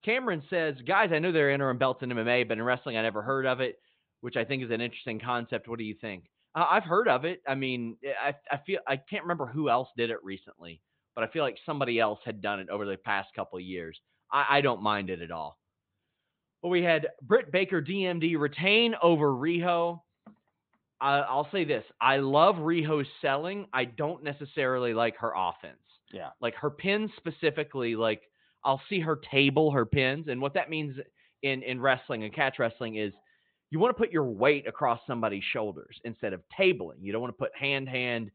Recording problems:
high frequencies cut off; severe; nothing above 4 kHz

